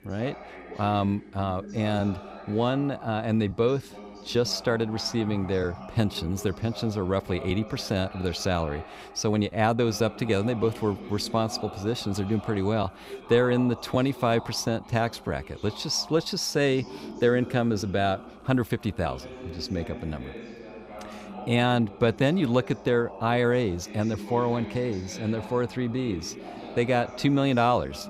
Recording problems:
voice in the background; noticeable; throughout; 15 dB below the speech

